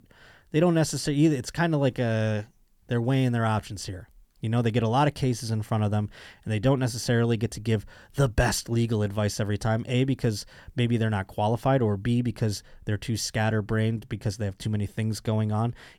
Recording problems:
none

